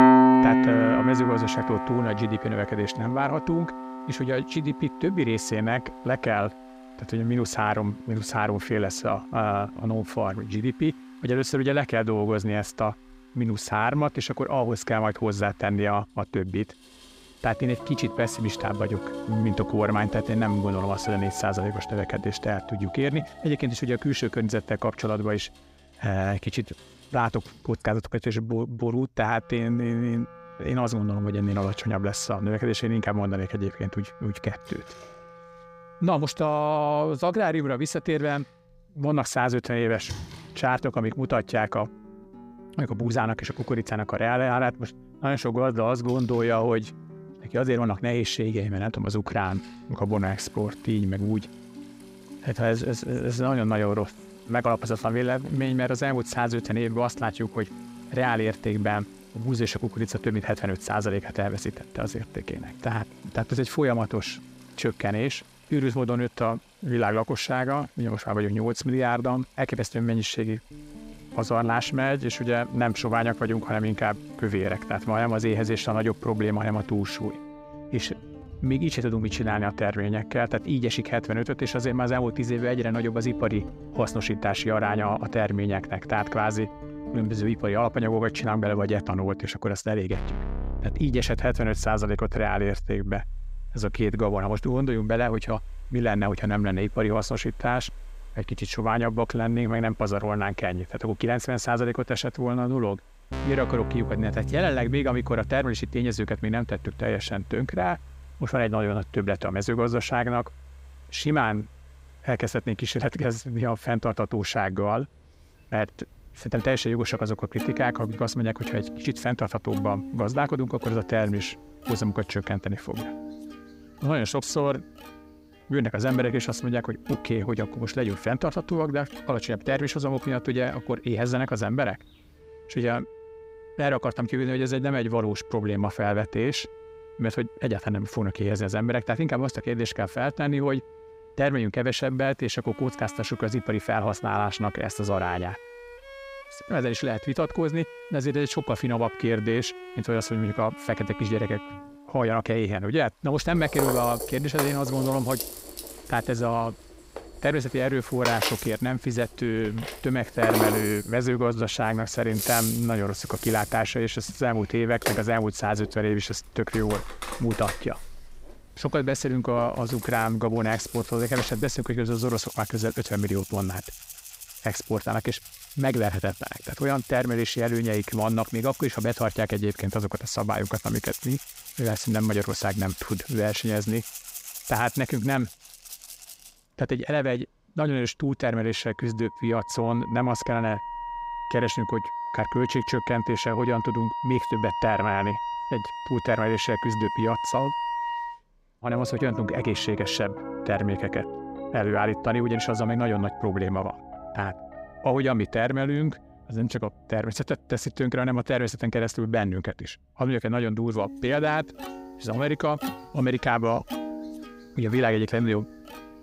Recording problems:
background music; loud; throughout; 9 dB below the speech
rain or running water; faint; throughout; 25 dB below the speech

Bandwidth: 15.5 kHz